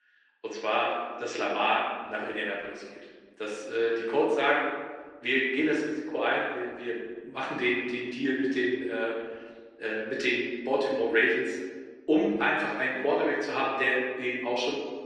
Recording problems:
off-mic speech; far
room echo; noticeable; dies away in 1.3 s
thin; somewhat; fading below 300 Hz
garbled, watery; slightly

